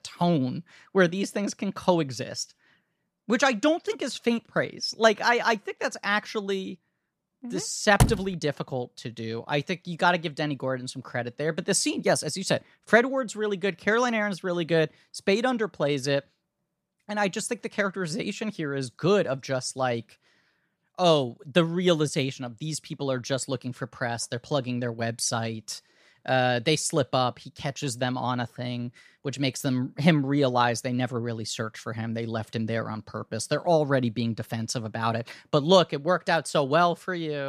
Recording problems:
door banging; loud; at 8 s; peak 2 dB above the speech
abrupt cut into speech; at the end

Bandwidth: 14.5 kHz